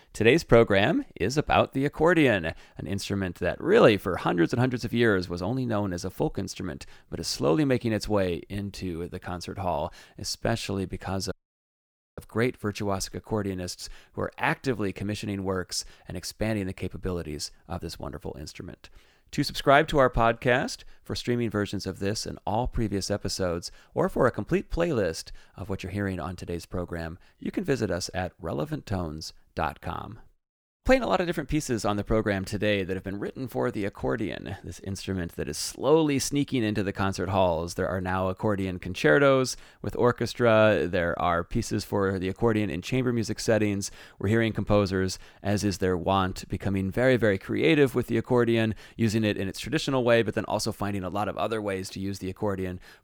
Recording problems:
audio cutting out; at 11 s for 1 s

